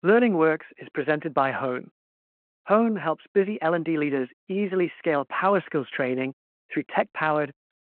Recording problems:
phone-call audio

